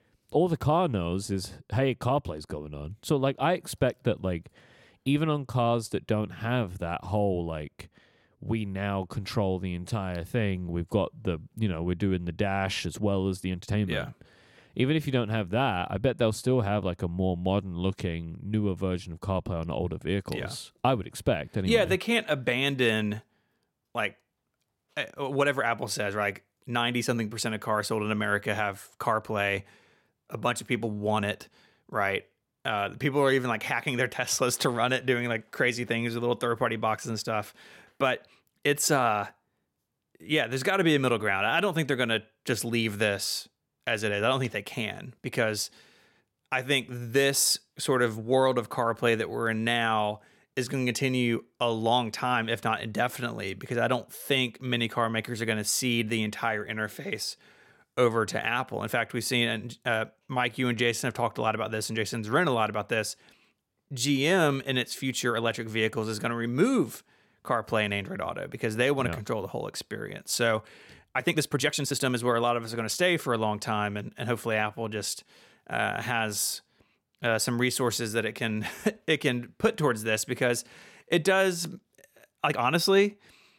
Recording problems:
uneven, jittery; strongly; from 13 s to 1:23

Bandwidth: 16.5 kHz